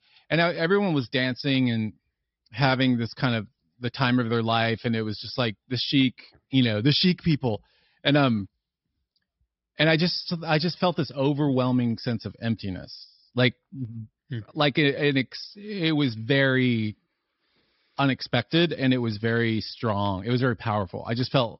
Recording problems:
high frequencies cut off; noticeable; nothing above 5.5 kHz

